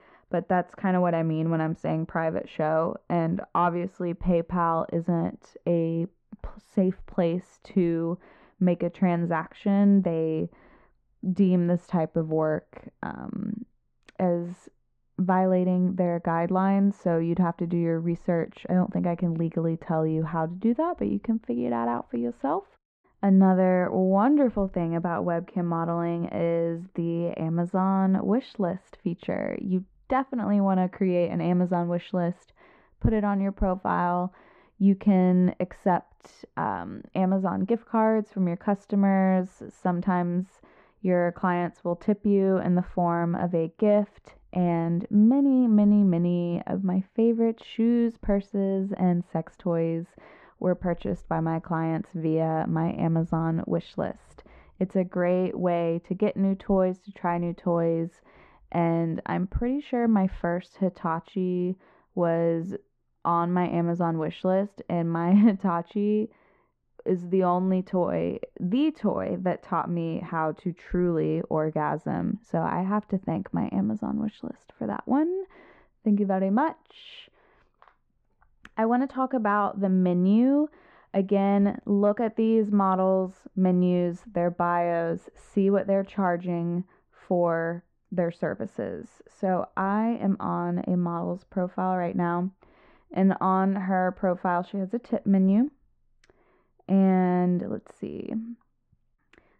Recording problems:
muffled; very; fading above 1.5 kHz

